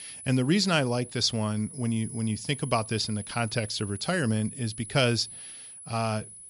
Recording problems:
high-pitched whine; noticeable; throughout; 10 kHz, 15 dB below the speech

